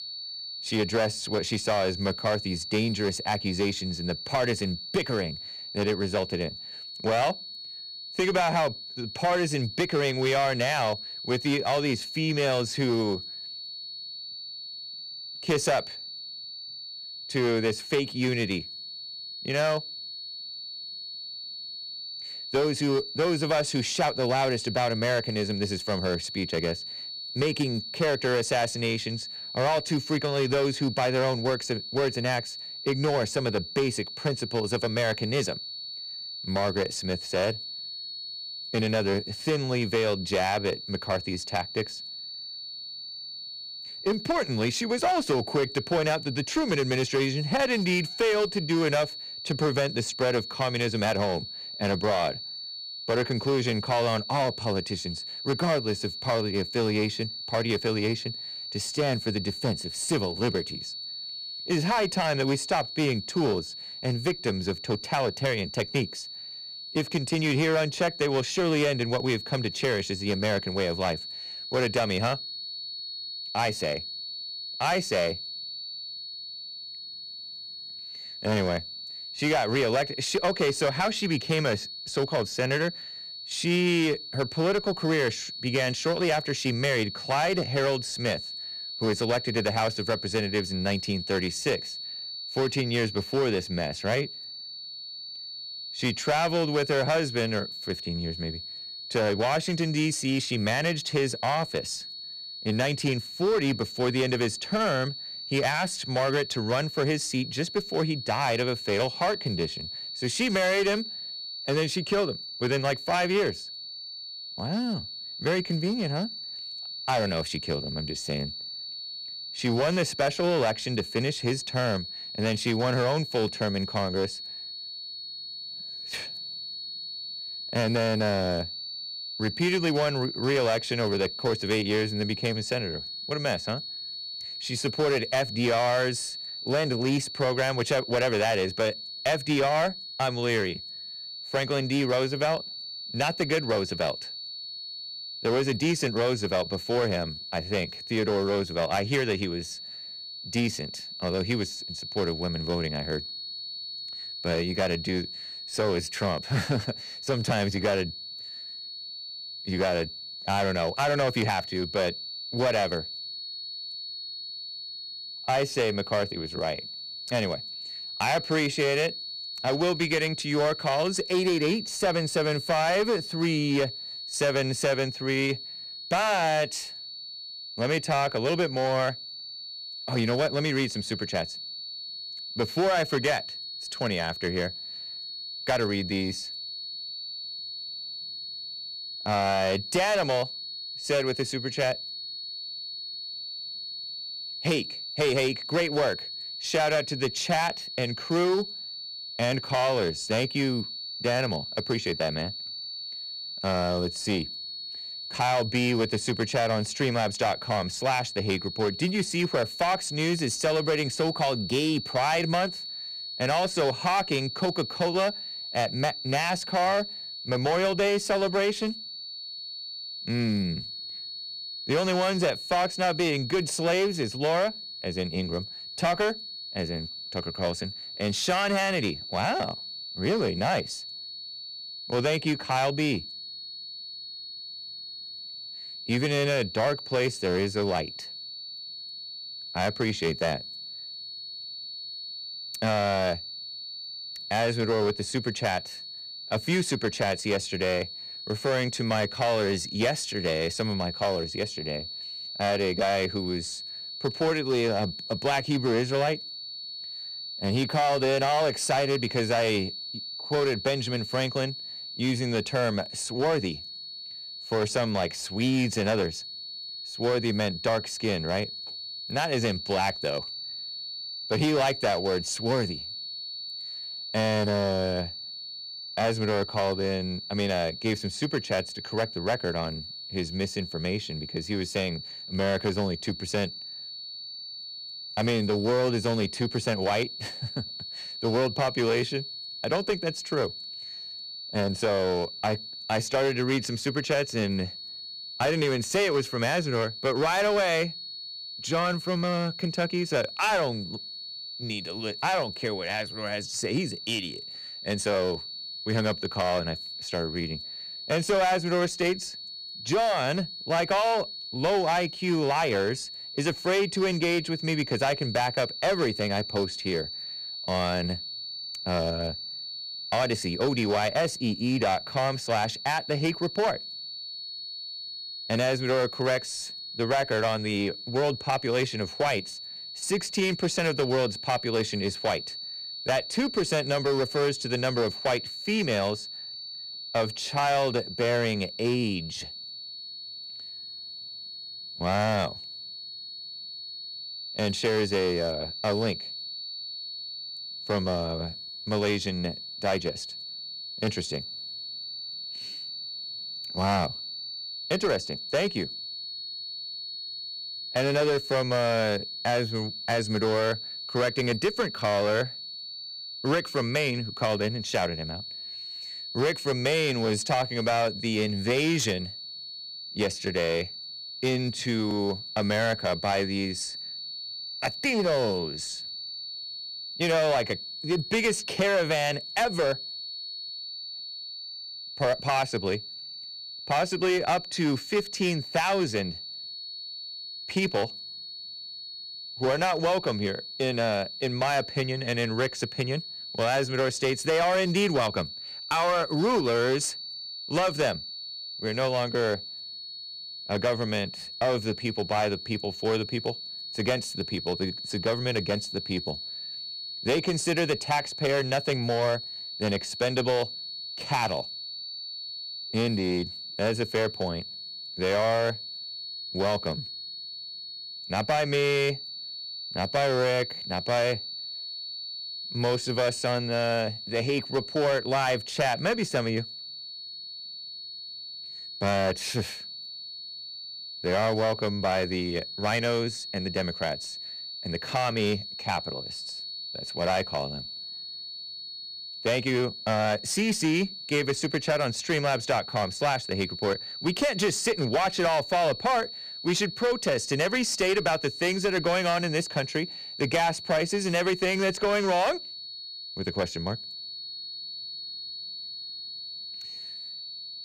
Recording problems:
distortion; slight; 7% of the sound clipped
high-pitched whine; loud; throughout; 4.5 kHz, 8 dB below the speech

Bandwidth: 15 kHz